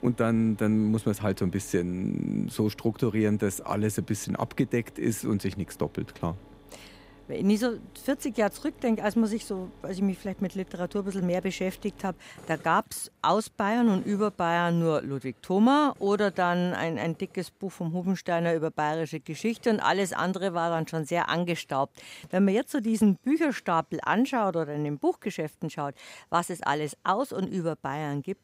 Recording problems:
machinery noise; faint; throughout; 25 dB below the speech

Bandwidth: 15.5 kHz